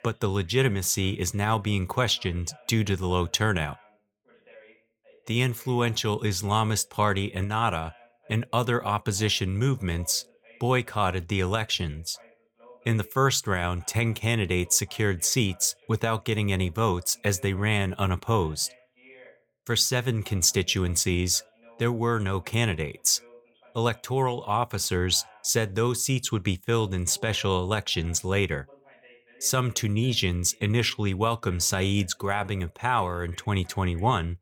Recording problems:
voice in the background; faint; throughout; 30 dB below the speech

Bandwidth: 18 kHz